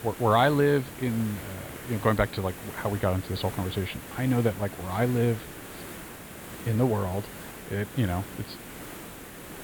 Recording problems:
high frequencies cut off; severe; nothing above 5 kHz
hiss; noticeable; throughout; 15 dB below the speech

